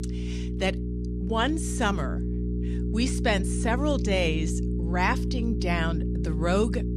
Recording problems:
electrical hum; loud; throughout; 60 Hz, 10 dB below the speech

